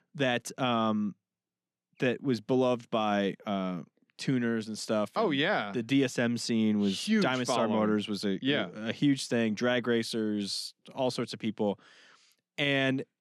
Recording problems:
none

